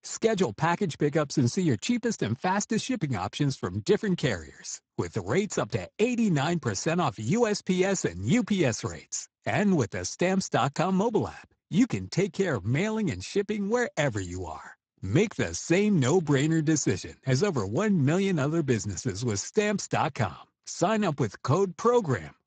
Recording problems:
garbled, watery; badly; nothing above 7.5 kHz

